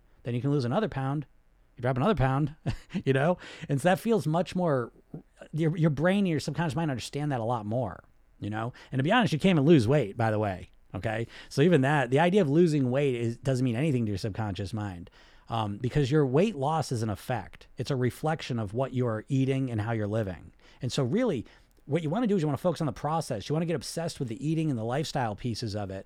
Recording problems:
none

